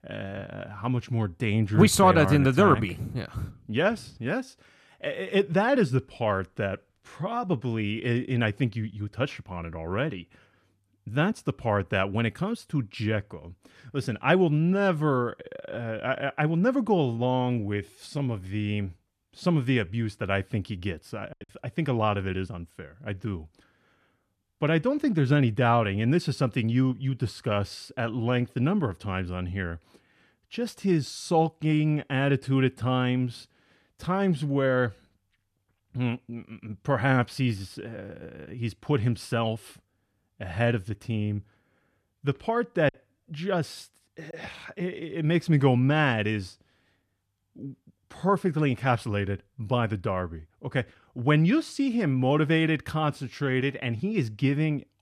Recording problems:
choppy; occasionally; at 21 s and from 43 to 44 s; 2% of the speech affected

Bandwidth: 14.5 kHz